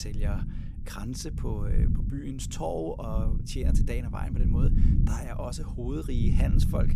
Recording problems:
low rumble; loud; throughout; 4 dB below the speech
abrupt cut into speech; at the start

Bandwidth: 15 kHz